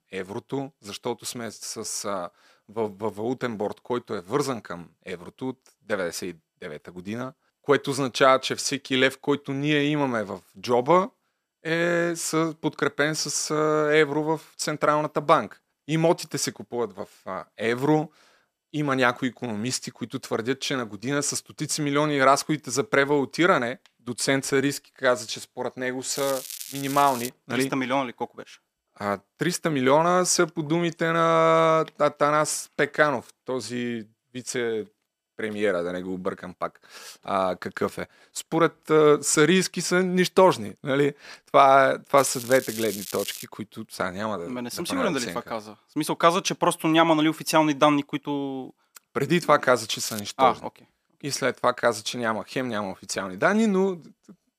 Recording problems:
crackling; noticeable; from 26 to 27 s, from 42 to 43 s and at 50 s; 10 dB below the speech

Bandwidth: 14.5 kHz